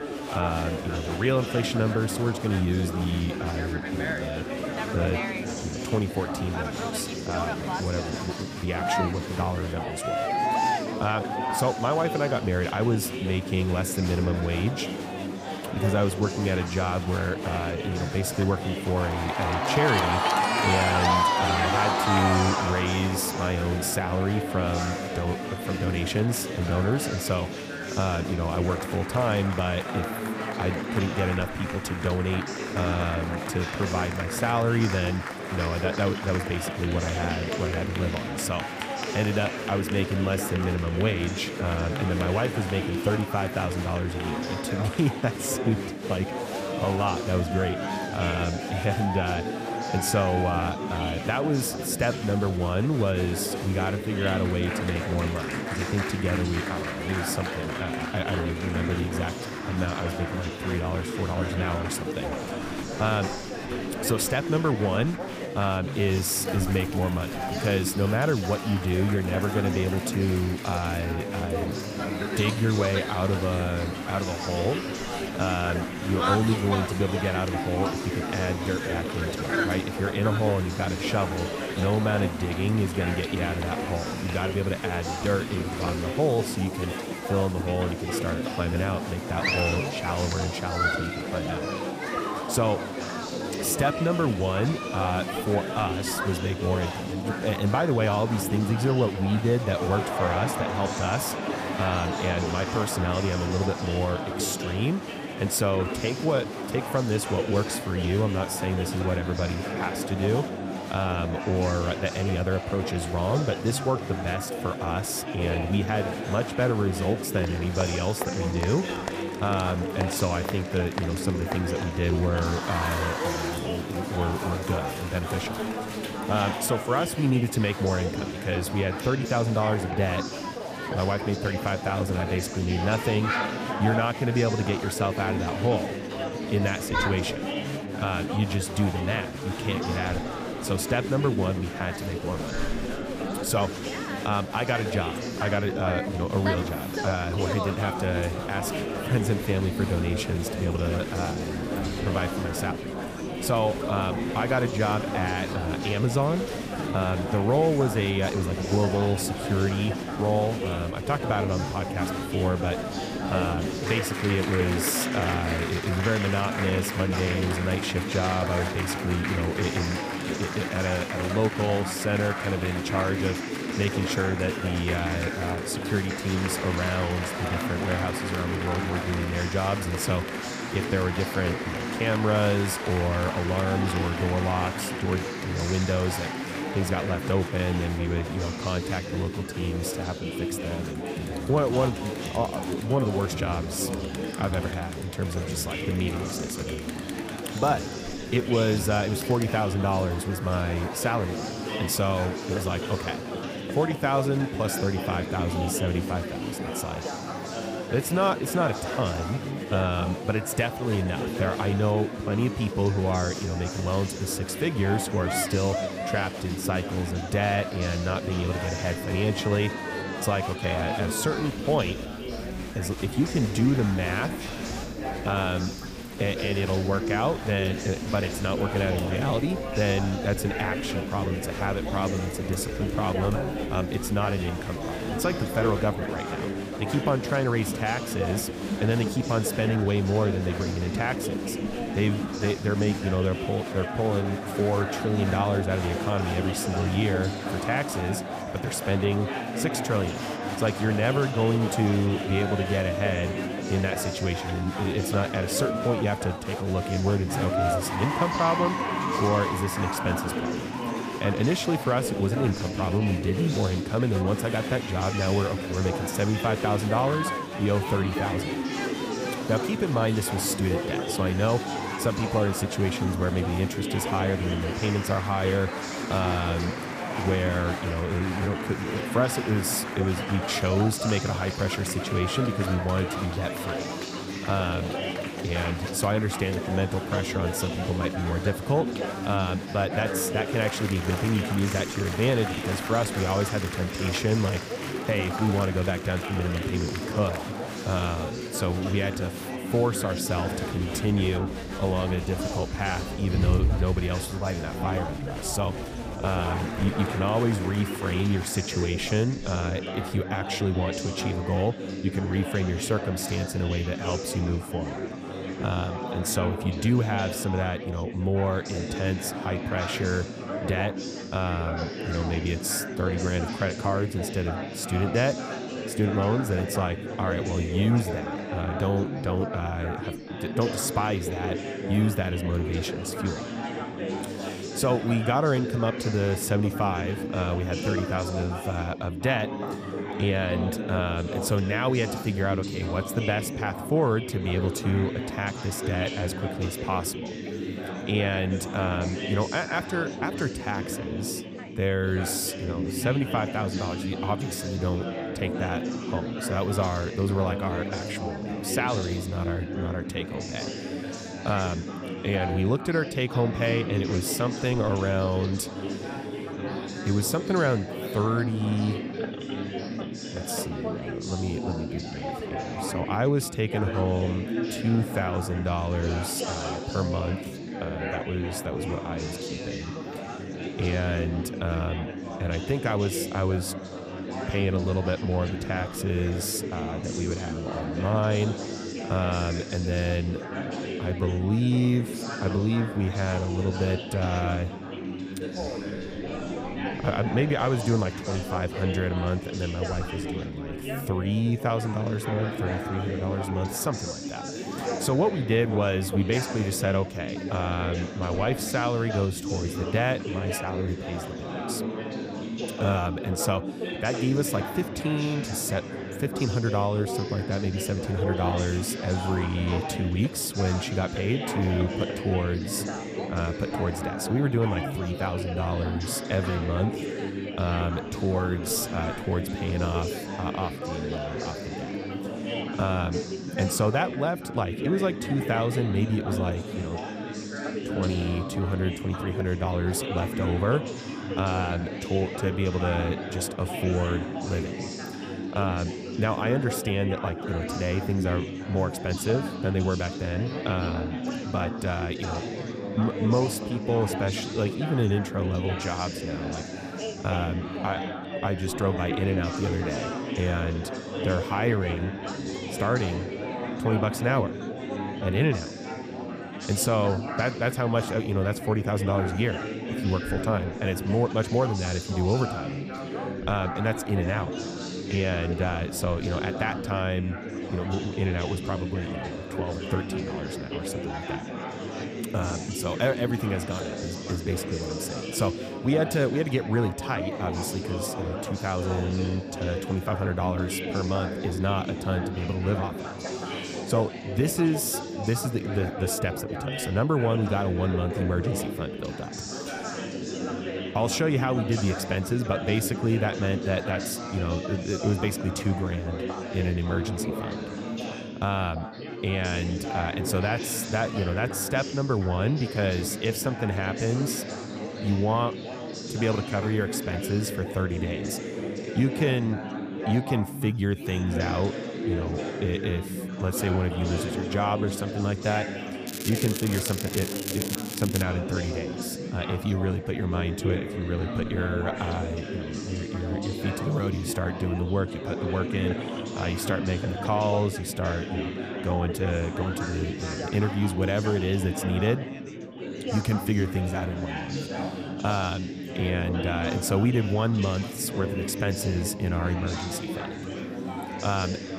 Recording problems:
chatter from many people; loud; throughout; 4 dB below the speech
crackling; loud; from 8:46 to 8:48; 5 dB below the speech

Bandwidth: 15 kHz